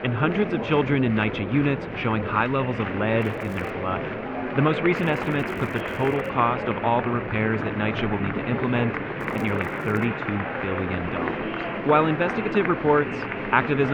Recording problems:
muffled; very; fading above 2.5 kHz
murmuring crowd; loud; throughout; 4 dB below the speech
traffic noise; faint; until 10 s; 20 dB below the speech
crackling; faint; at 3 s, from 5 to 6.5 s and at 9 s; 30 dB below the speech
abrupt cut into speech; at the end

